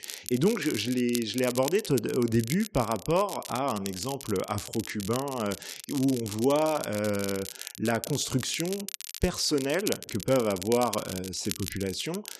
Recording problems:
crackle, like an old record; loud; 10 dB below the speech

